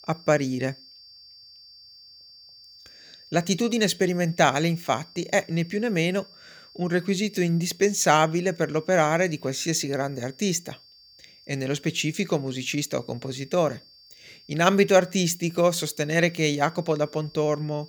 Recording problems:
high-pitched whine; faint; throughout; 4.5 kHz, 25 dB below the speech

